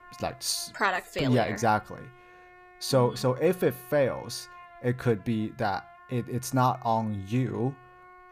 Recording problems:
background music; faint; throughout; 25 dB below the speech

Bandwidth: 15 kHz